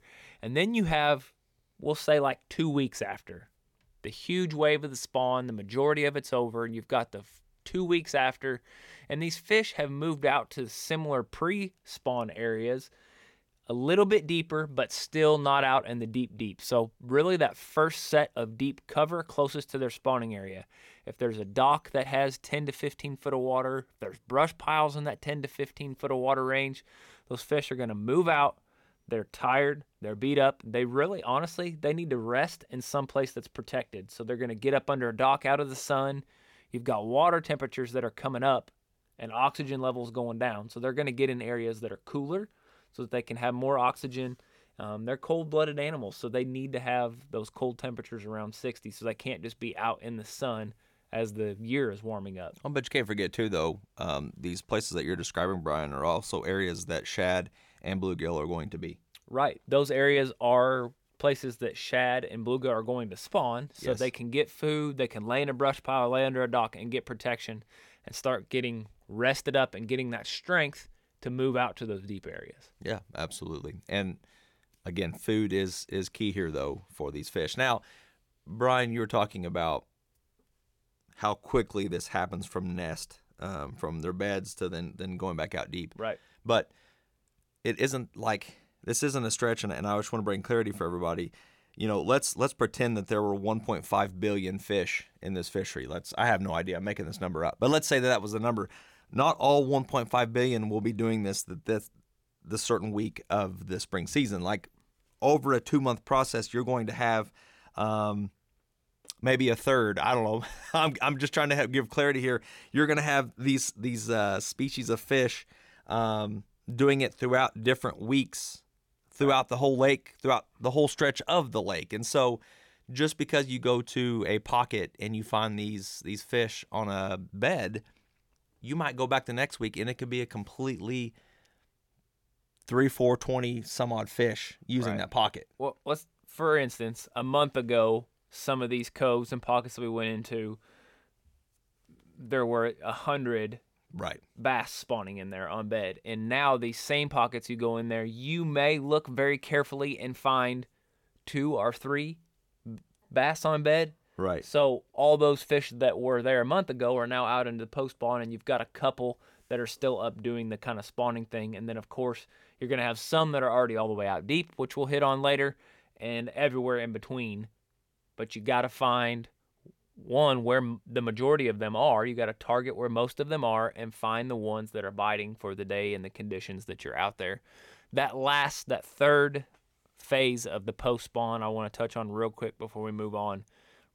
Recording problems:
none

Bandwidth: 17.5 kHz